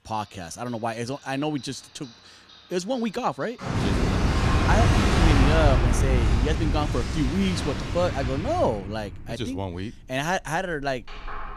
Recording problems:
household noises; very loud; throughout; 4 dB above the speech

